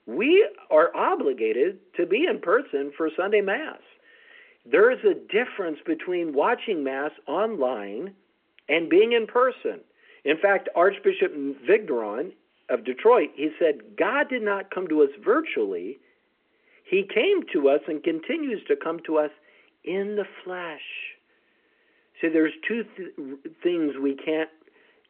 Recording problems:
phone-call audio

